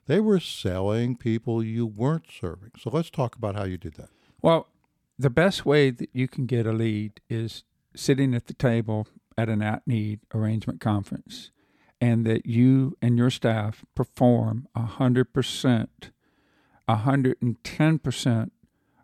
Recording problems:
none

